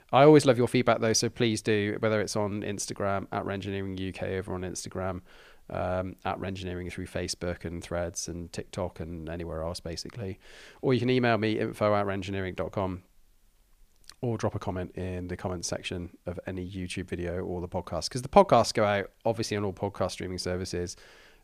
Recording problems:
none

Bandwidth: 15 kHz